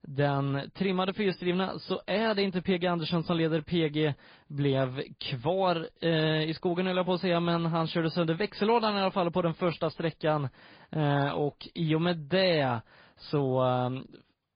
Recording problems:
high frequencies cut off; severe; nothing above 5 kHz
garbled, watery; slightly

